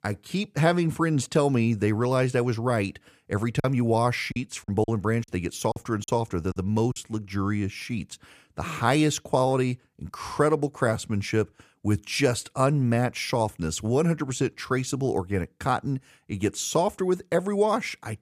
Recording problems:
choppy; very; from 3.5 to 7 s; 11% of the speech affected

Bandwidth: 14.5 kHz